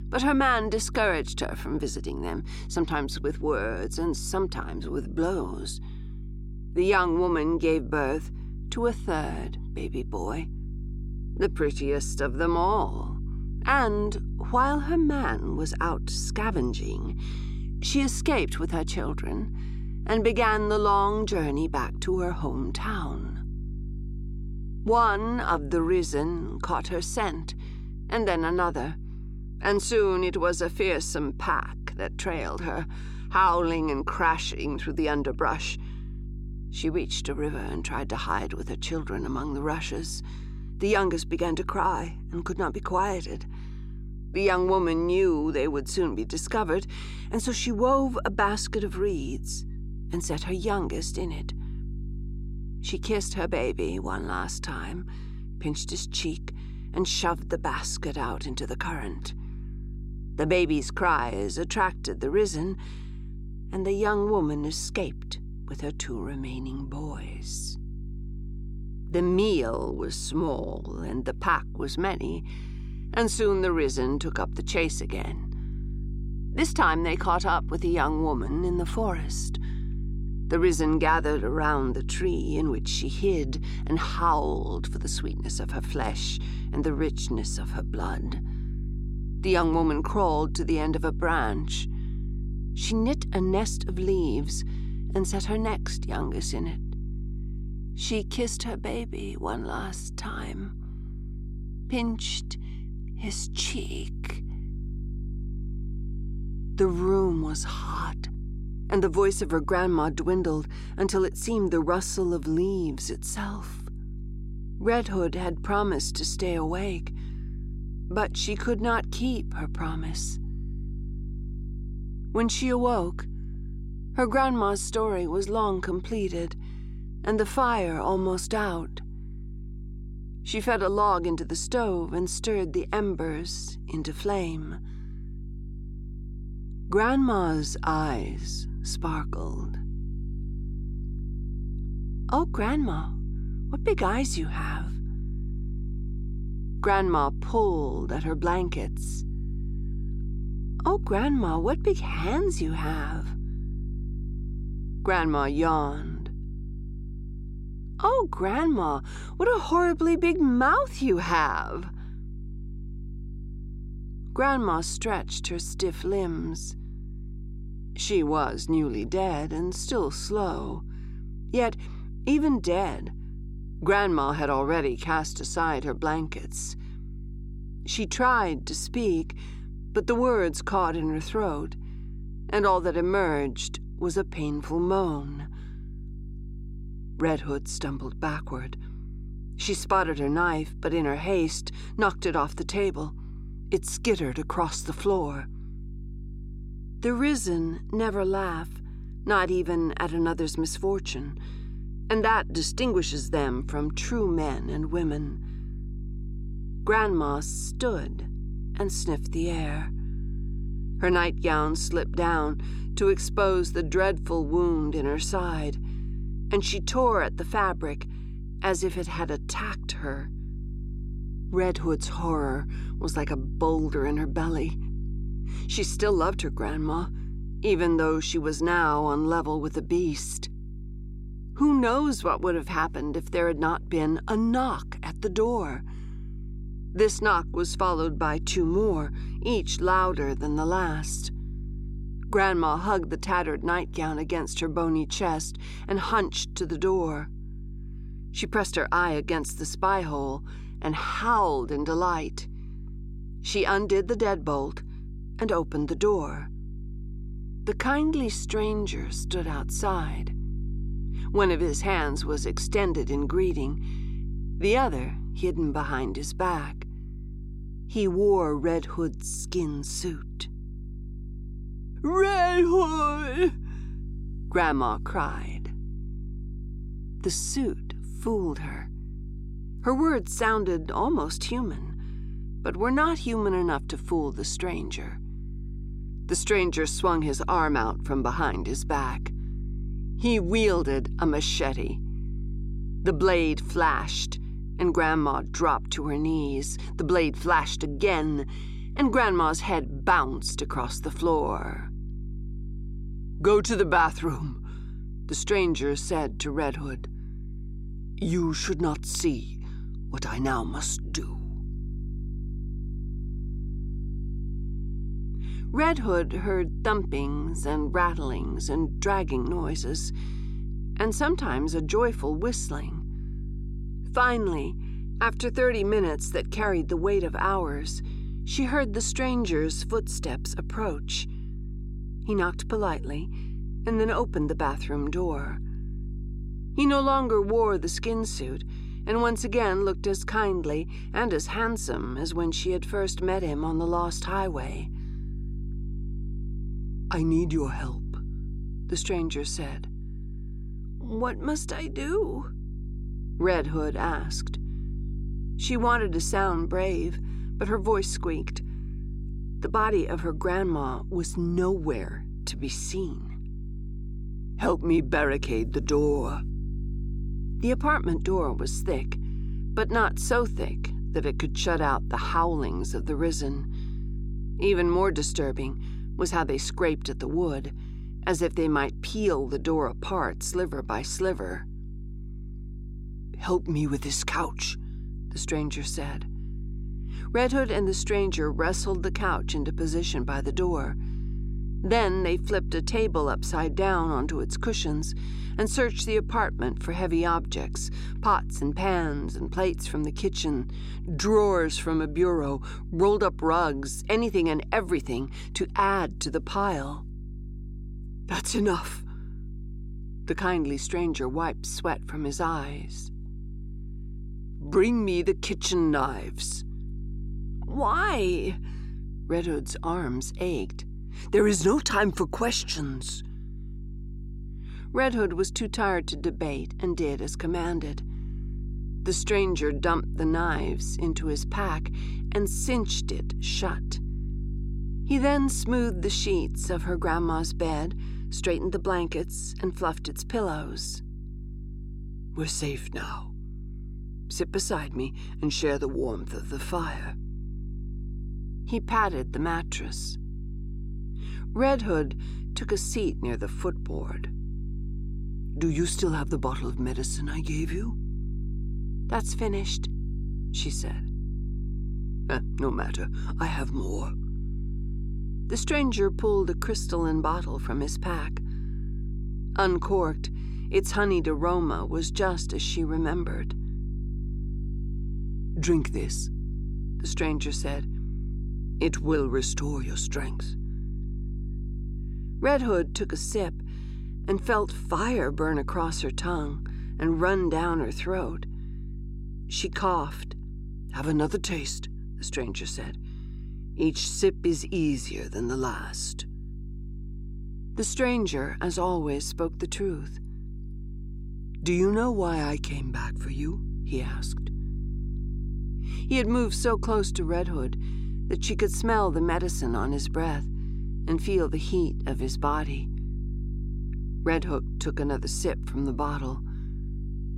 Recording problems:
electrical hum; faint; throughout; 50 Hz, 20 dB below the speech

